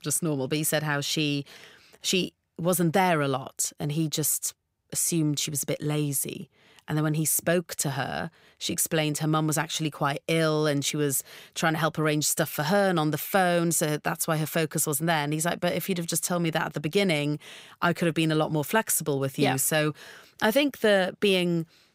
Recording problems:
none

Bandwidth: 15.5 kHz